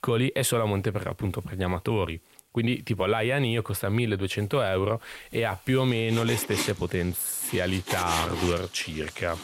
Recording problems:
household noises; loud; throughout; 8 dB below the speech

